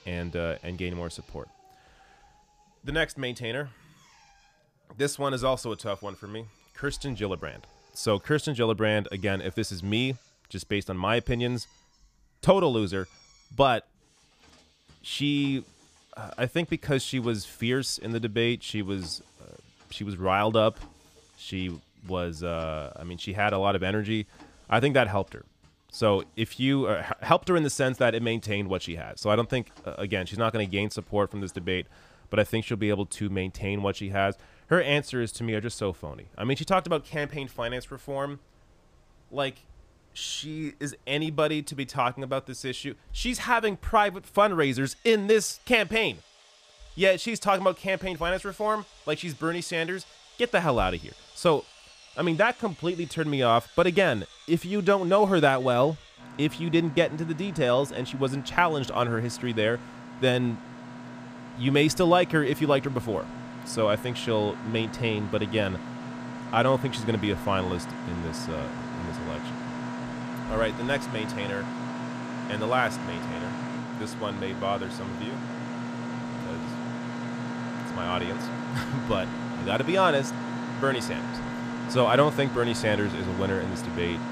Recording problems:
machinery noise; loud; throughout; 9 dB below the speech

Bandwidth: 15 kHz